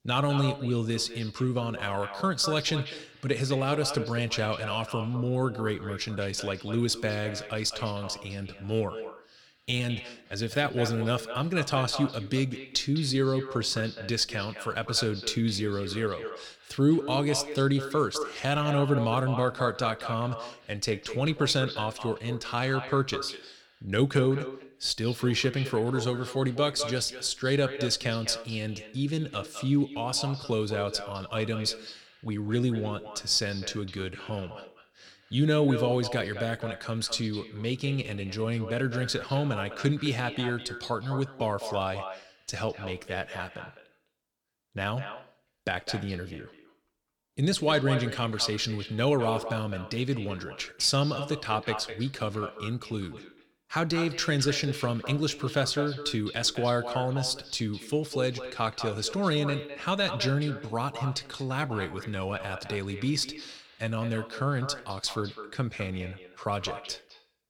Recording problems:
echo of what is said; strong; throughout; 210 ms later, 10 dB below the speech

